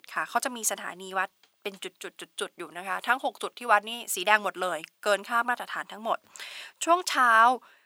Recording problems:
thin; very; fading below 700 Hz

